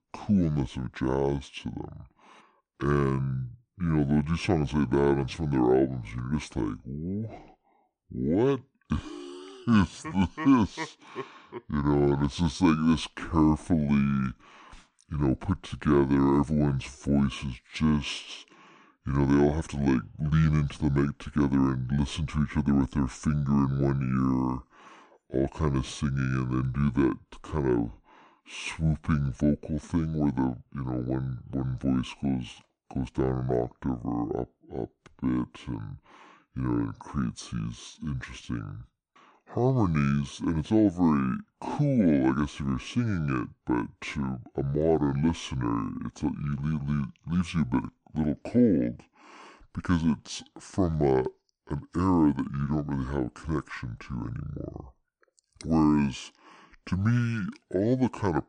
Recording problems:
wrong speed and pitch; too slow and too low; 0.6 times normal speed

